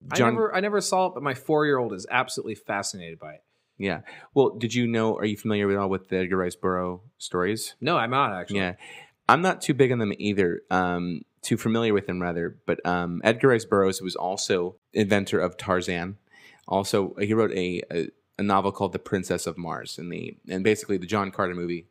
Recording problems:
none

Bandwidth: 15.5 kHz